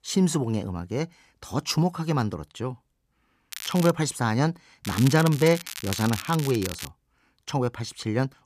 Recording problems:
crackling; loud; at 3.5 s and from 5 to 7 s; 10 dB below the speech

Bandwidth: 14.5 kHz